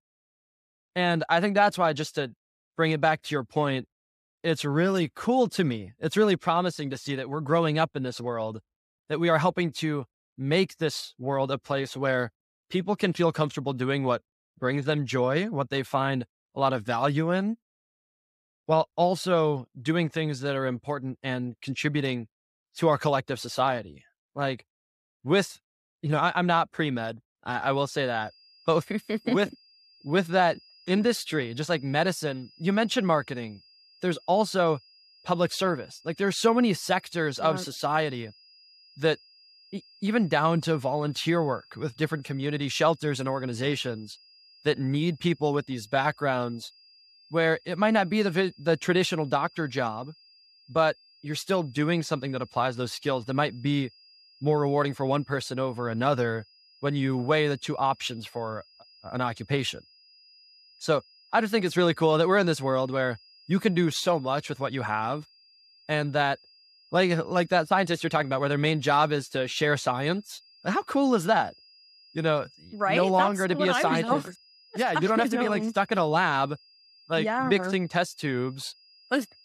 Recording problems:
high-pitched whine; faint; from 28 s on; 5 kHz, 30 dB below the speech

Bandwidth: 14.5 kHz